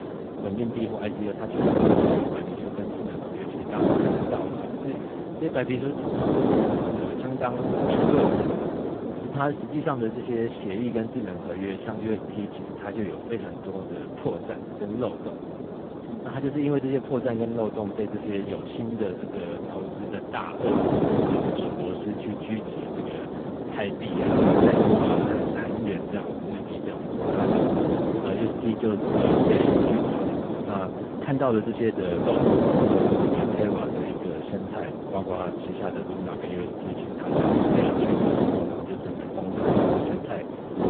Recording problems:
phone-call audio; poor line
wind noise on the microphone; heavy; 4 dB above the speech

